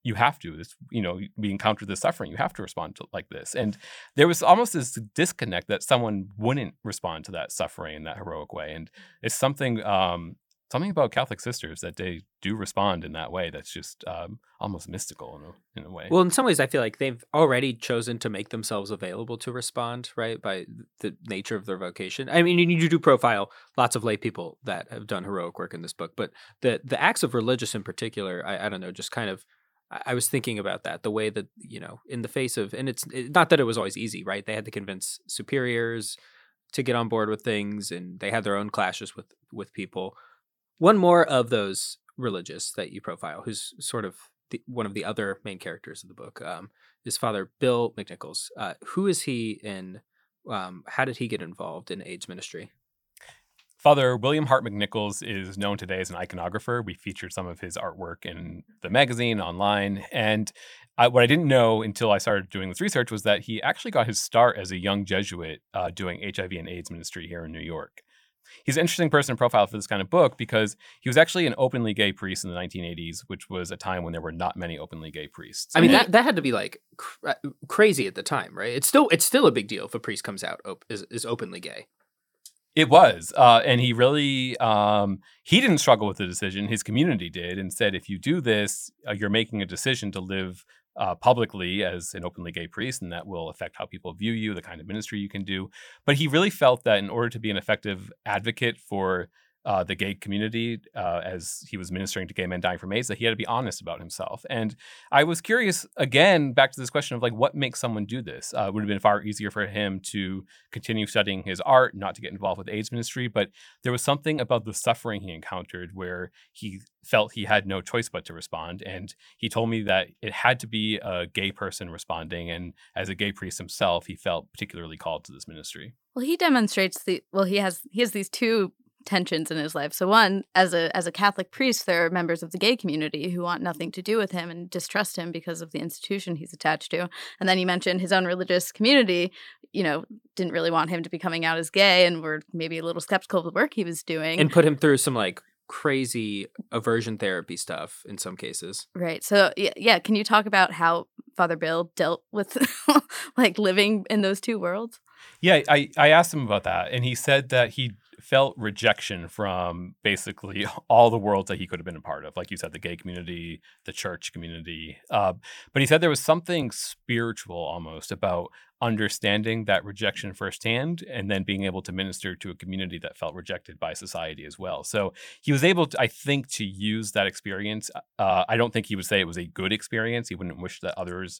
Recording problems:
none

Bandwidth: 18 kHz